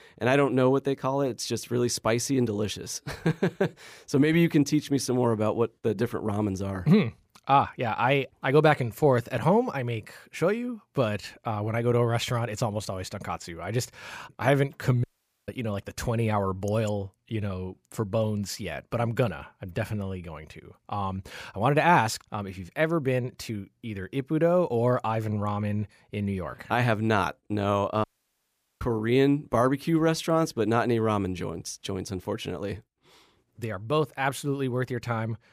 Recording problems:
audio cutting out; at 15 s and at 28 s for 1 s

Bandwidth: 15 kHz